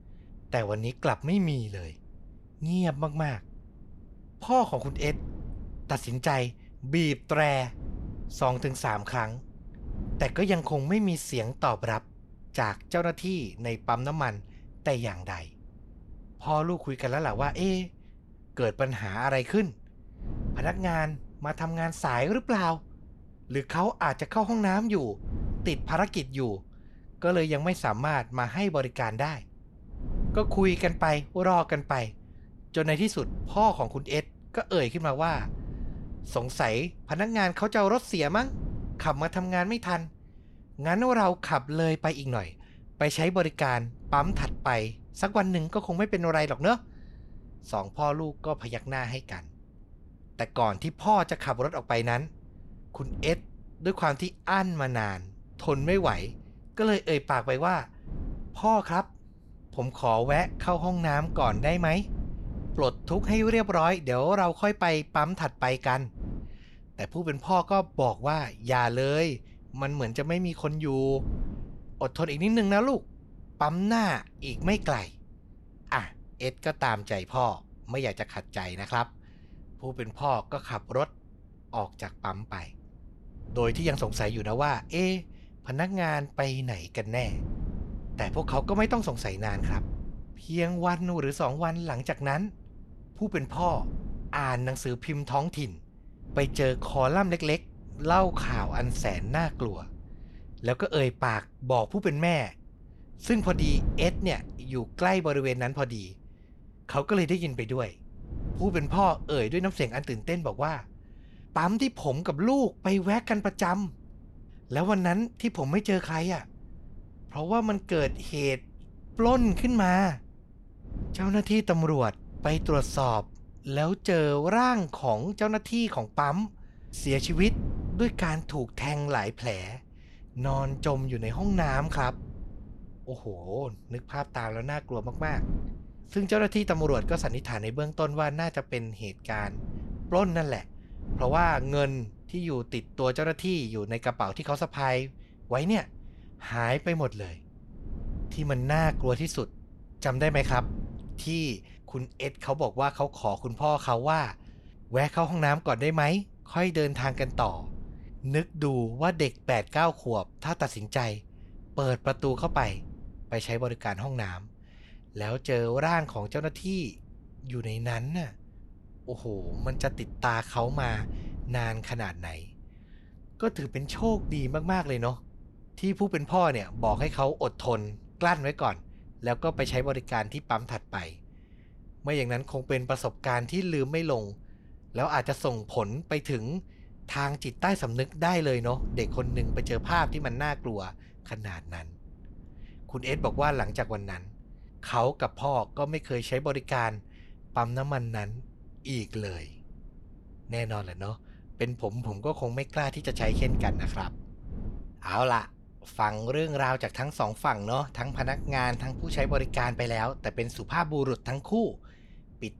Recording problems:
wind noise on the microphone; occasional gusts; 25 dB below the speech

